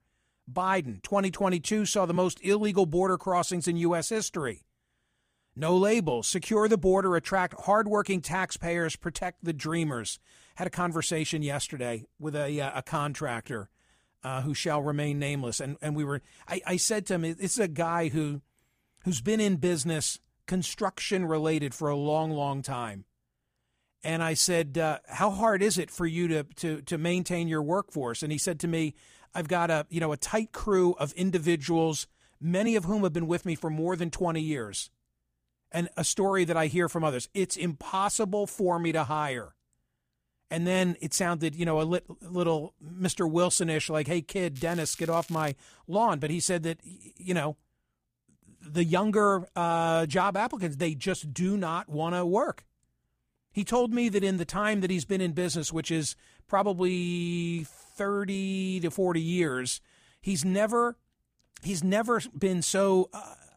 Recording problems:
crackling; noticeable; at 45 s; 20 dB below the speech

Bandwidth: 15 kHz